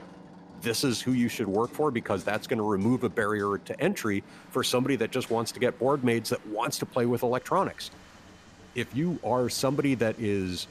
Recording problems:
machinery noise; faint; throughout; 25 dB below the speech
rain or running water; faint; throughout; 25 dB below the speech

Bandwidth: 14.5 kHz